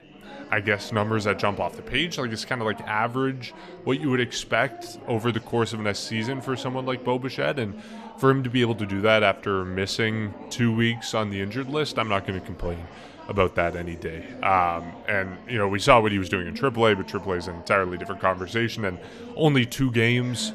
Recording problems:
chatter from many people; noticeable; throughout; 15 dB below the speech

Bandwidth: 14.5 kHz